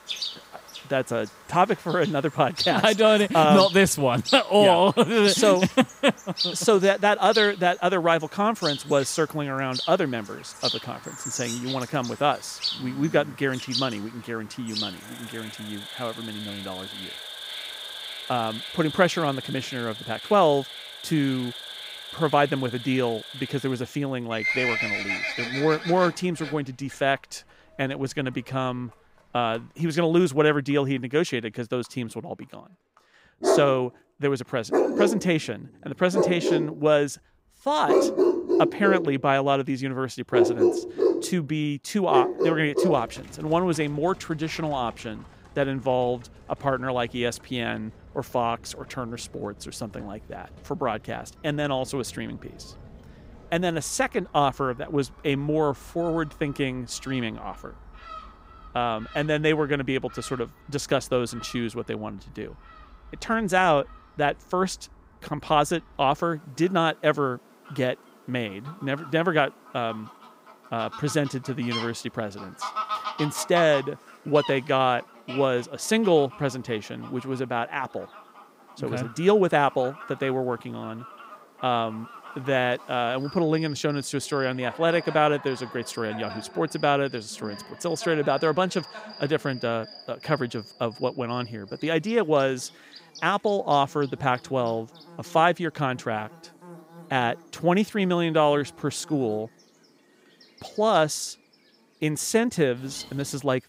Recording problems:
animal sounds; loud; throughout; 5 dB below the speech

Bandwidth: 15.5 kHz